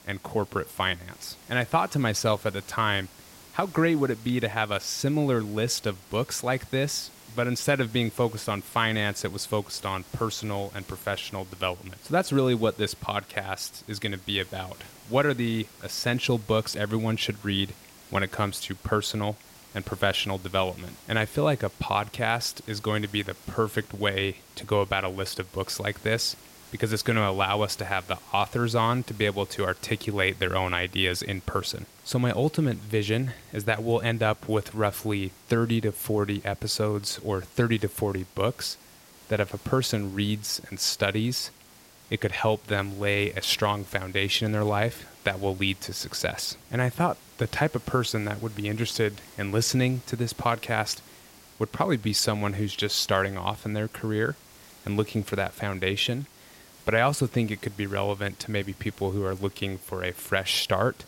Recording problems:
hiss; faint; throughout; 20 dB below the speech

